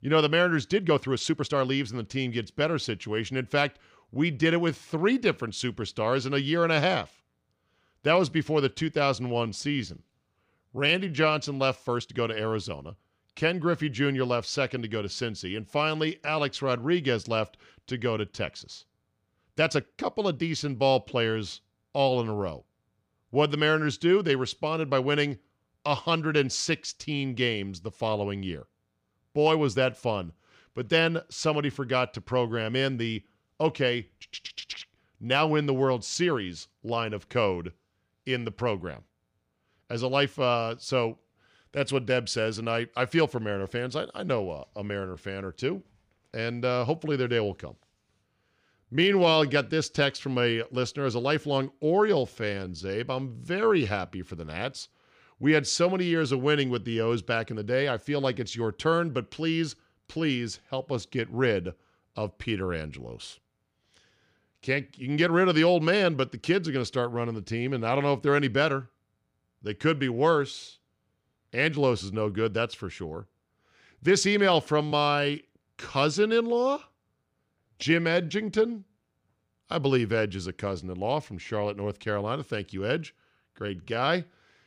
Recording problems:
uneven, jittery; strongly; from 0.5 s to 1:24

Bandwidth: 15 kHz